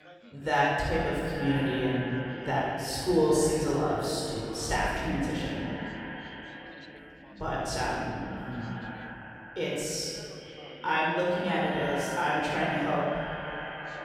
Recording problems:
echo of what is said; strong; throughout; 400 ms later, 10 dB below the speech
room echo; strong; dies away in 1.8 s
off-mic speech; far
background chatter; faint; throughout; 2 voices, 25 dB below the speech

